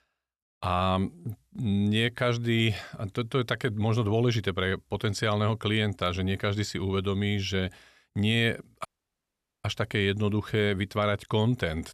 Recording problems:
audio cutting out; at 9 s for 1 s

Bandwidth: 13.5 kHz